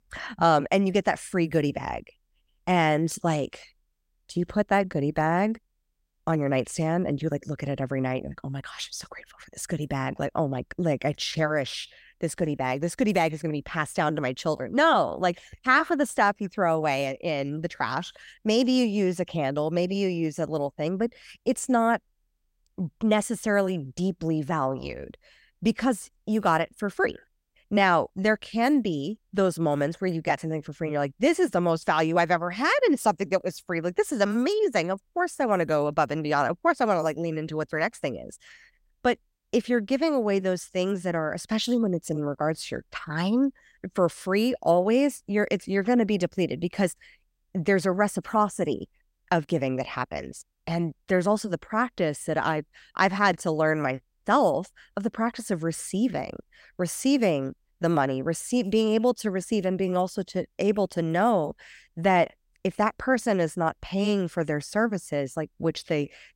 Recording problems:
none

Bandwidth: 16 kHz